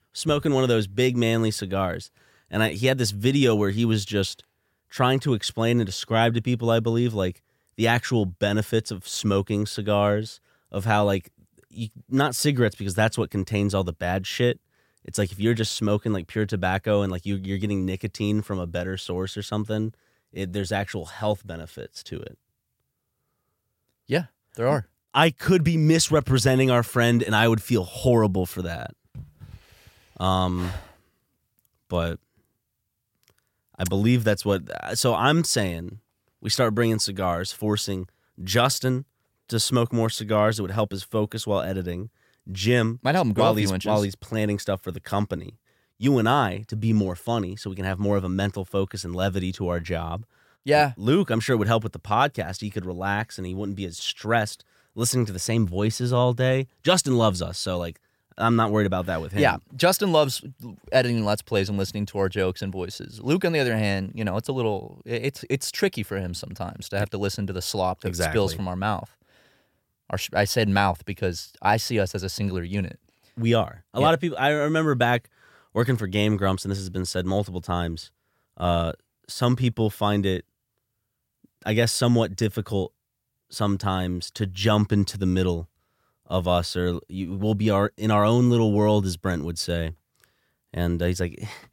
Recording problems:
none

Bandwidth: 16.5 kHz